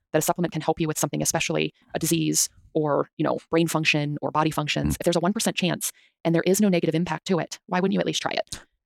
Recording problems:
wrong speed, natural pitch; too fast; 1.7 times normal speed

